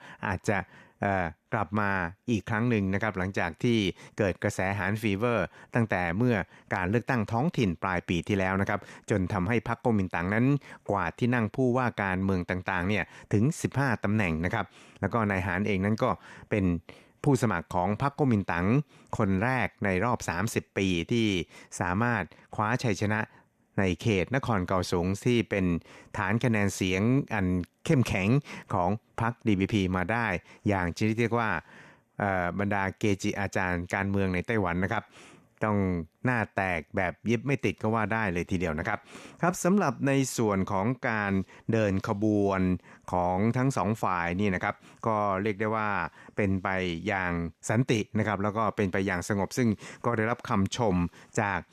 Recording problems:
none

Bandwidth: 14.5 kHz